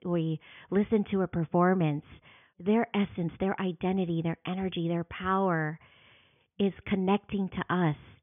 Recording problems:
high frequencies cut off; severe; nothing above 3.5 kHz

